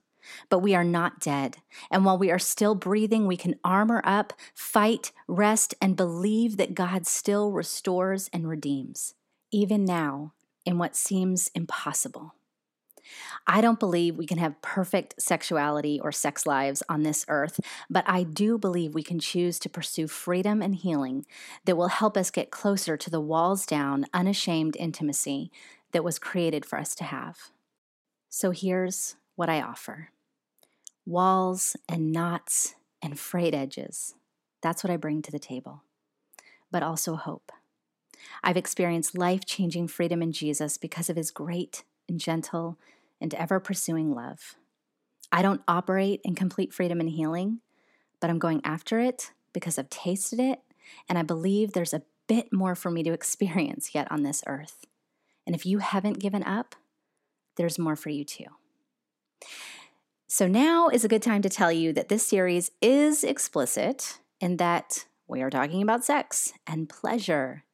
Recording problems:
none

